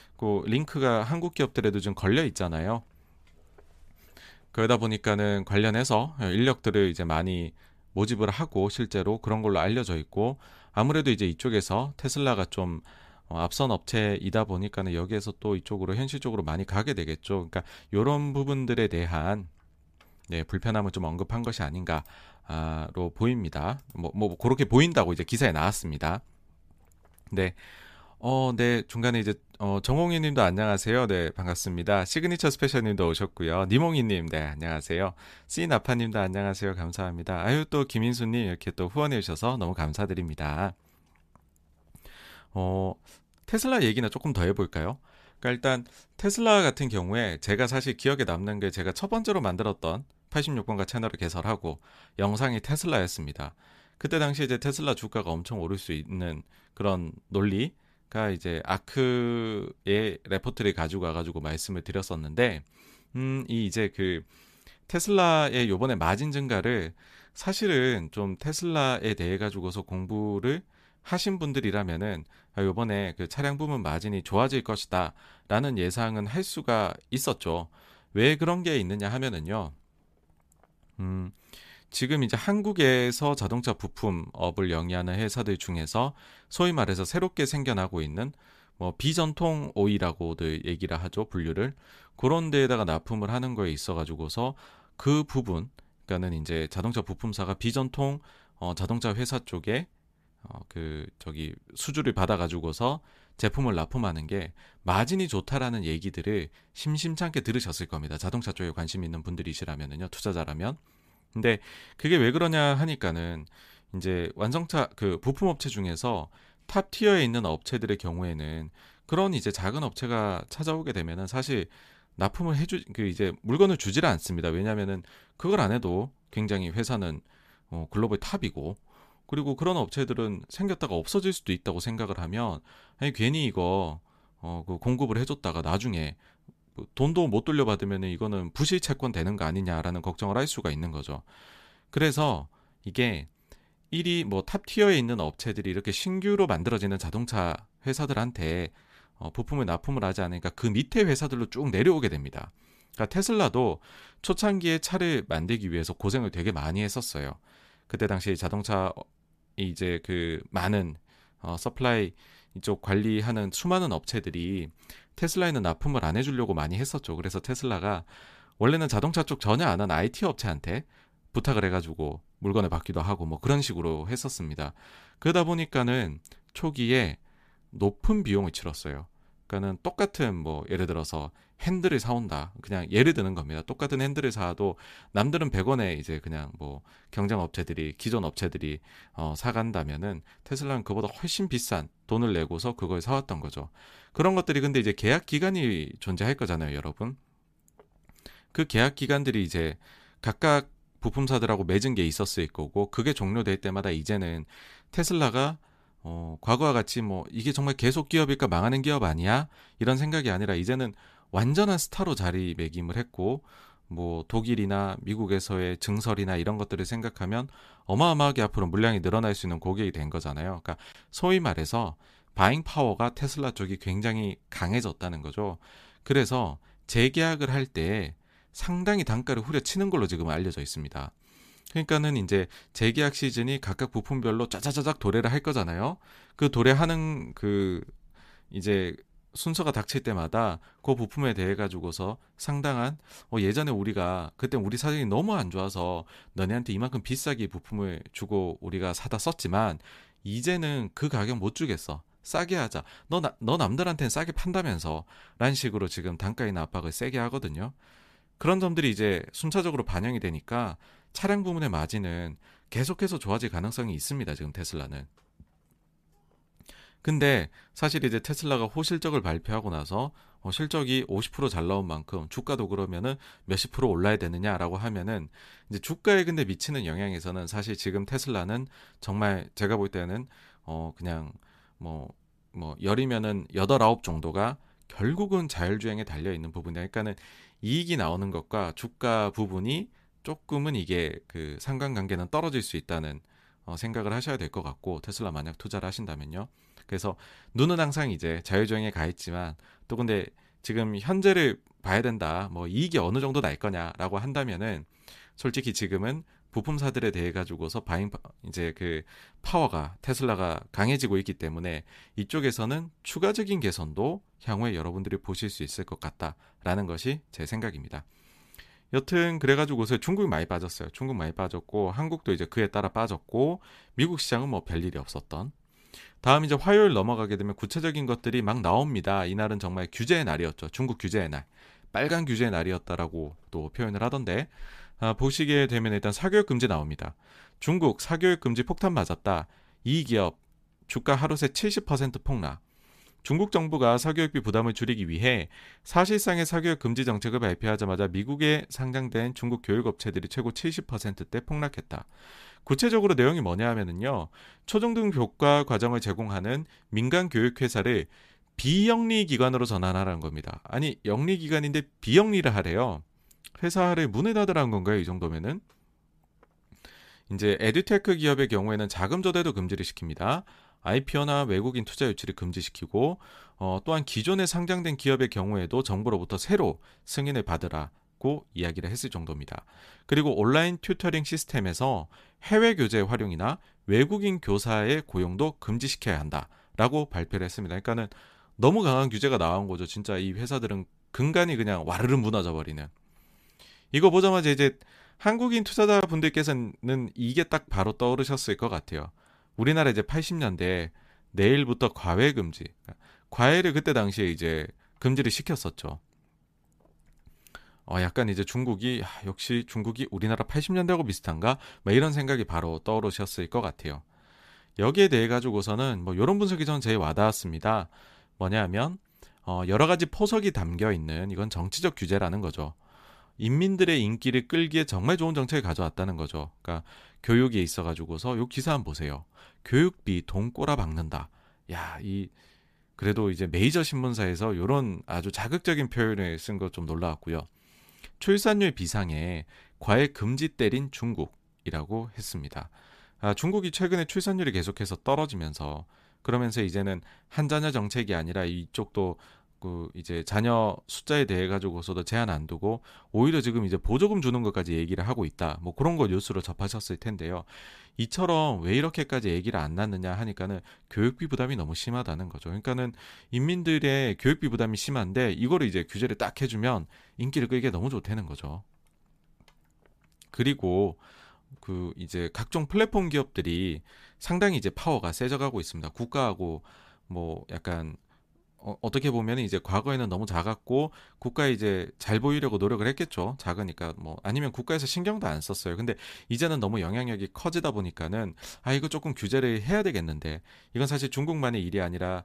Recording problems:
none

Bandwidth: 14.5 kHz